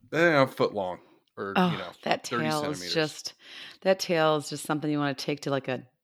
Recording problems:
none

